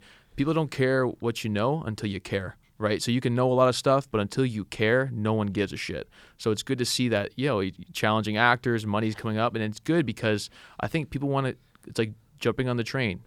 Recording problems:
none

